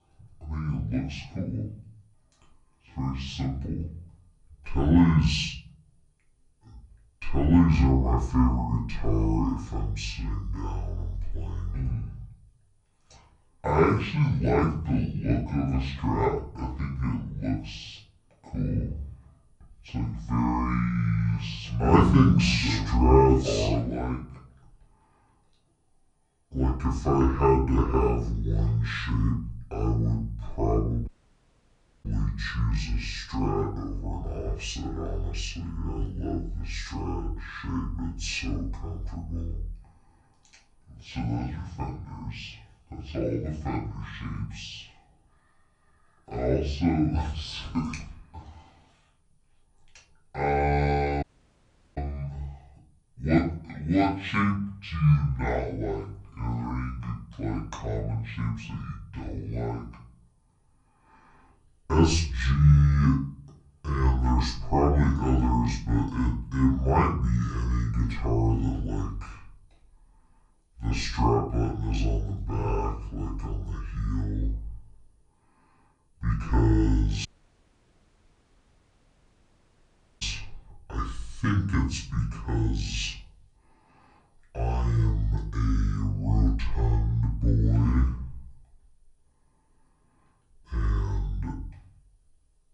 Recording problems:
off-mic speech; far
wrong speed and pitch; too slow and too low; 0.6 times normal speed
room echo; slight; dies away in 0.5 s
audio cutting out; at 31 s for 1 s, at 51 s for 0.5 s and at 1:17 for 3 s

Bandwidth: 10.5 kHz